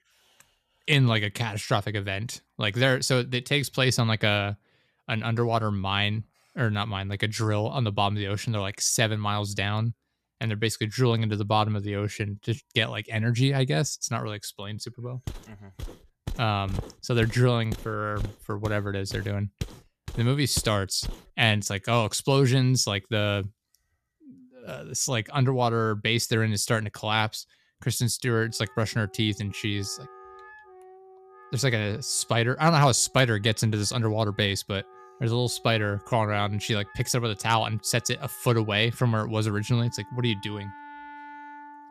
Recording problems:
background music; faint; throughout; 25 dB below the speech
footsteps; faint; from 15 to 21 s; peak 10 dB below the speech

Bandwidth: 14.5 kHz